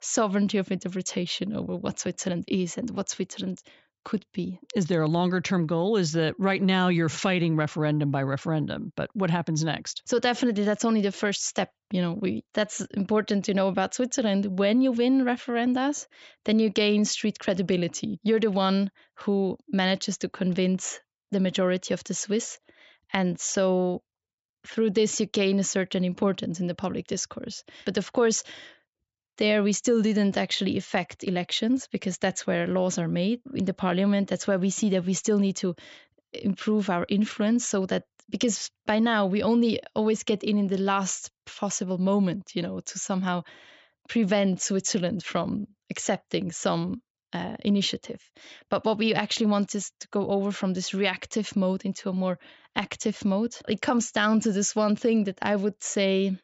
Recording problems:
high frequencies cut off; noticeable; nothing above 8 kHz

